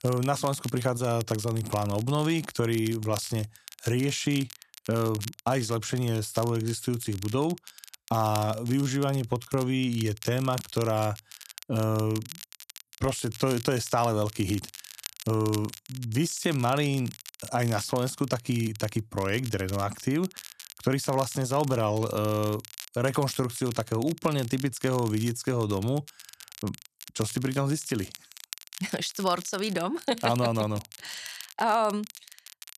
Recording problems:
crackle, like an old record; noticeable; 15 dB below the speech

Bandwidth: 14 kHz